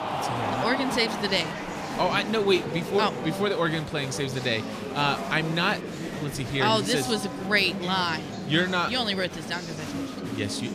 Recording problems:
murmuring crowd; loud; throughout; 7 dB below the speech

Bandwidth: 14.5 kHz